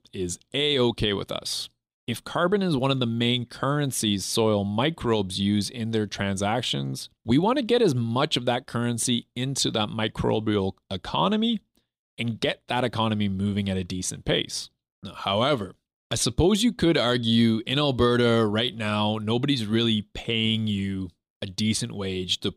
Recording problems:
none

